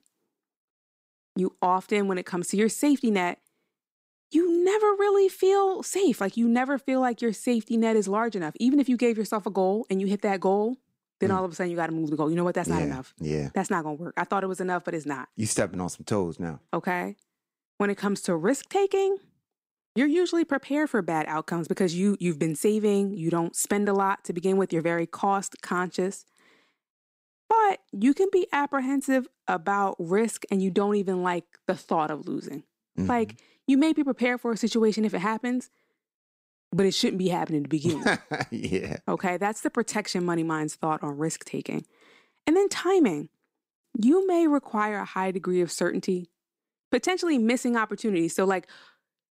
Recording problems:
none

